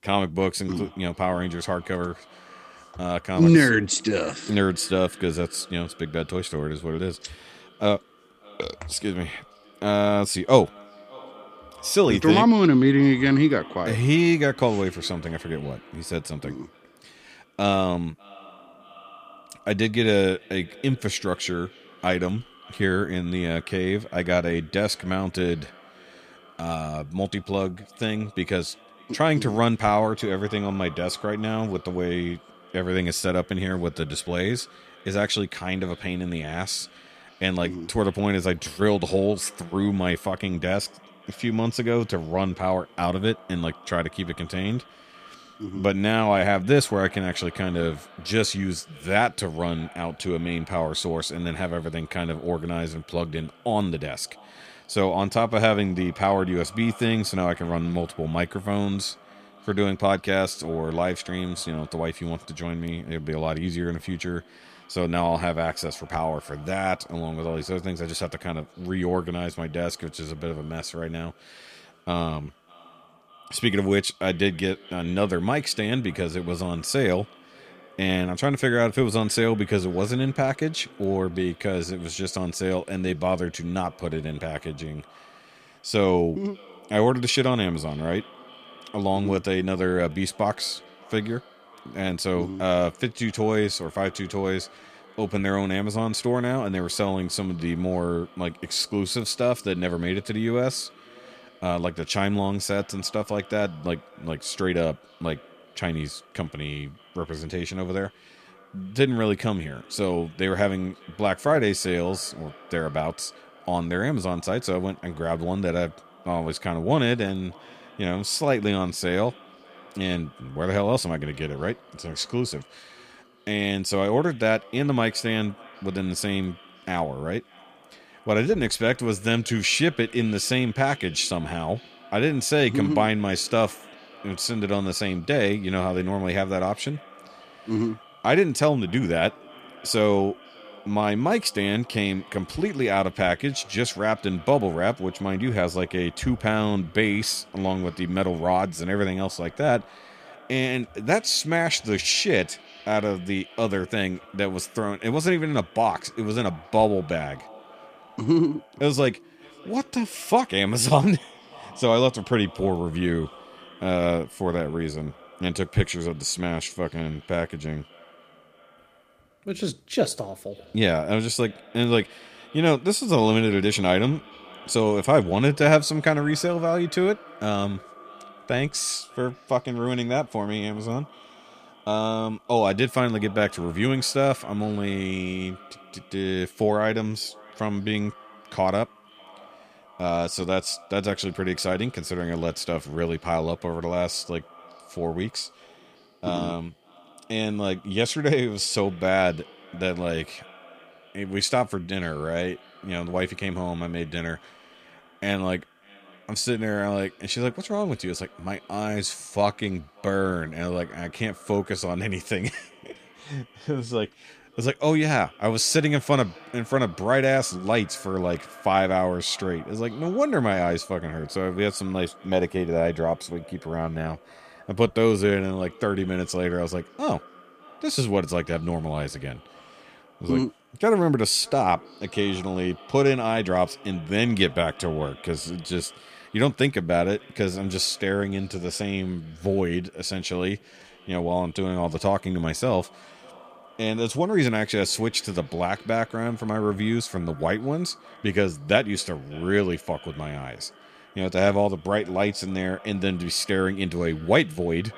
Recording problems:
echo of what is said; faint; throughout; 600 ms later, 25 dB below the speech

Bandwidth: 15 kHz